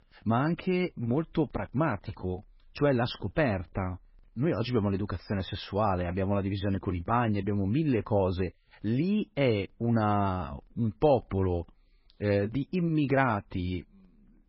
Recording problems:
garbled, watery; badly; nothing above 5.5 kHz

